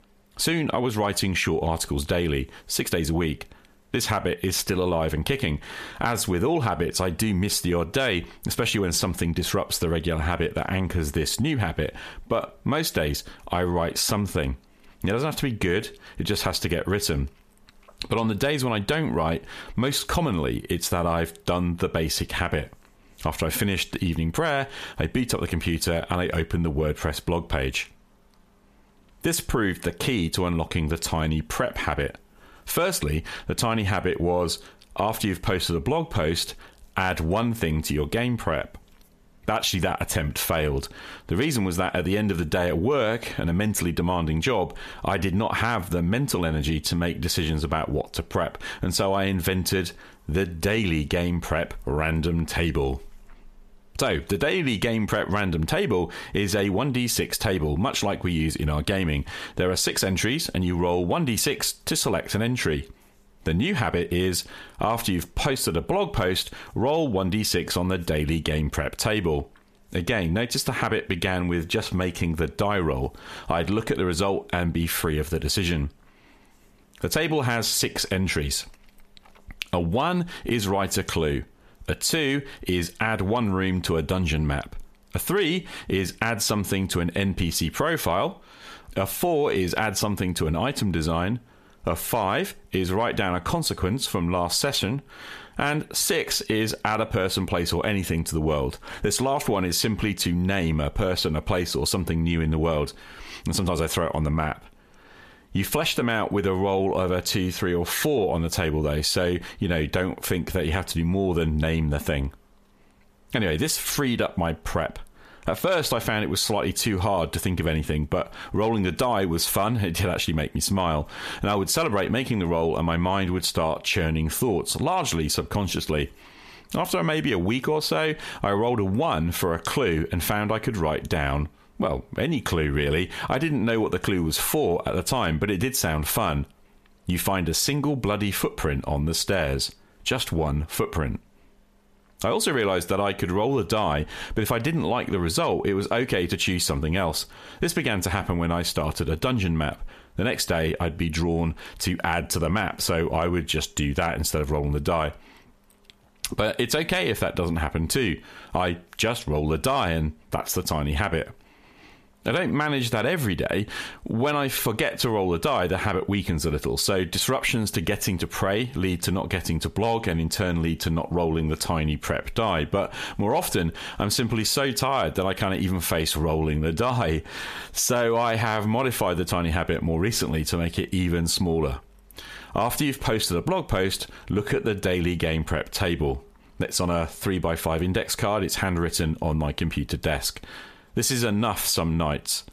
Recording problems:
squashed, flat; heavily

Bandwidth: 14.5 kHz